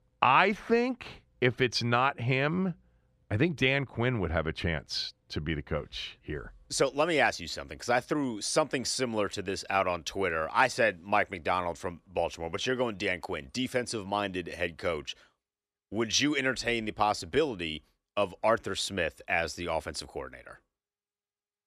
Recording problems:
none

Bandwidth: 14.5 kHz